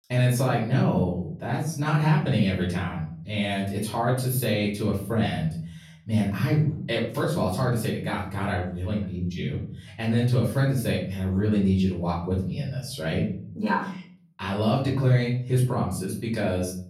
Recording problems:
off-mic speech; far
room echo; noticeable; dies away in 0.6 s

